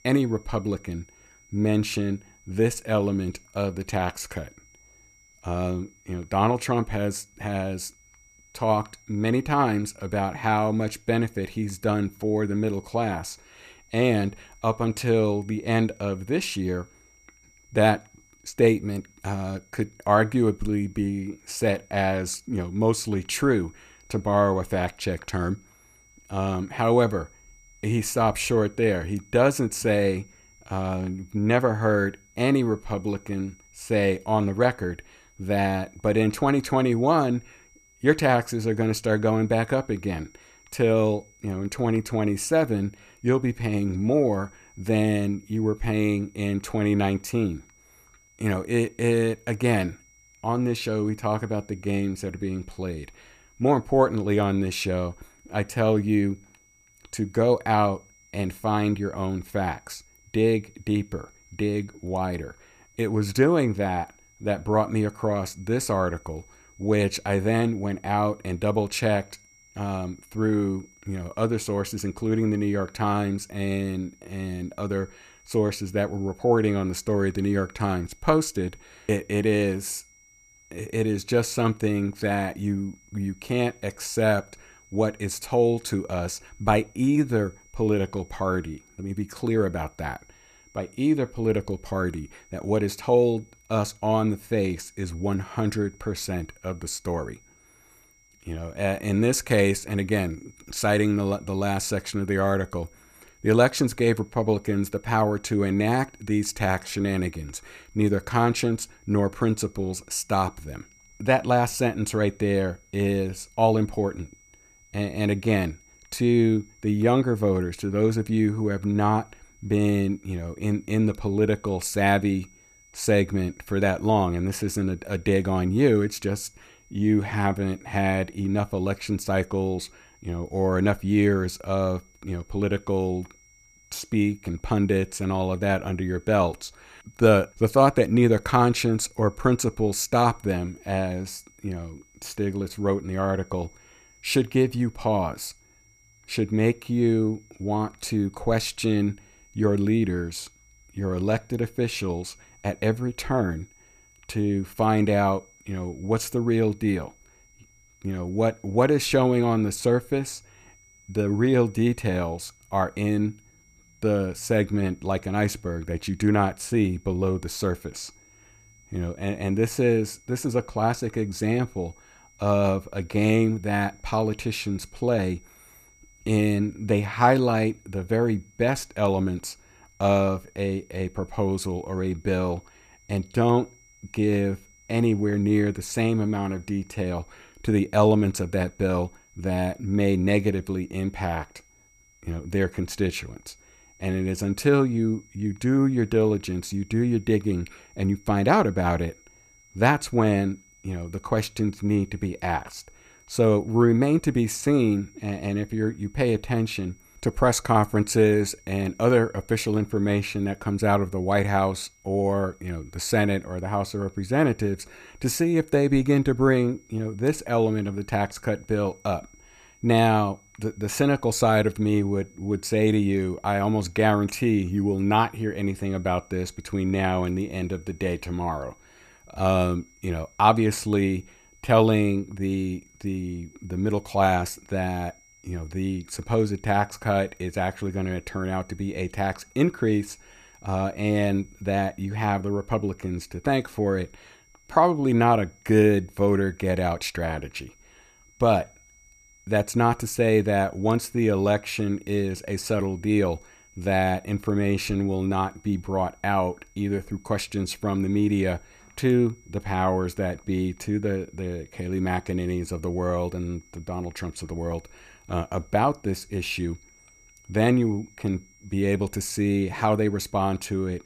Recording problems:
high-pitched whine; faint; throughout; 2 kHz, 30 dB below the speech

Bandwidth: 14.5 kHz